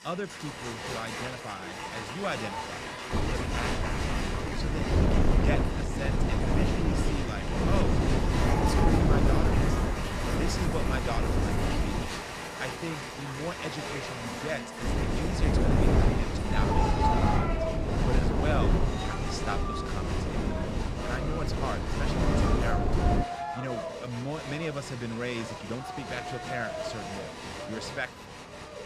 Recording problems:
crowd noise; very loud; throughout; 1 dB above the speech
wind noise on the microphone; heavy; from 3 to 12 s and from 15 to 23 s; 3 dB above the speech
uneven, jittery; slightly; from 1.5 to 26 s

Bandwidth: 15 kHz